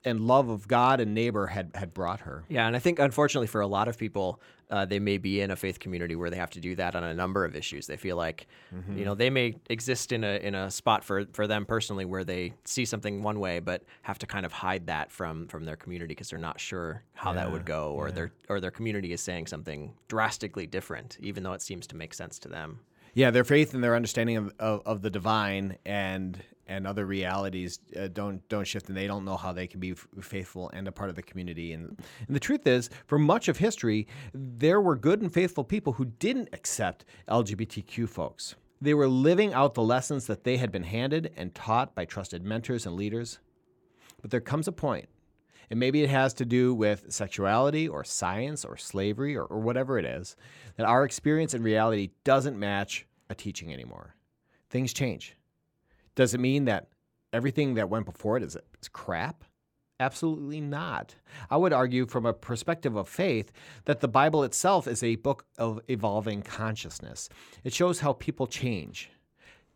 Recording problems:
none

